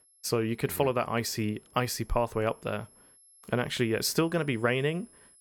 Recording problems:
high-pitched whine; faint; throughout; 11 kHz, 25 dB below the speech

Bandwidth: 17 kHz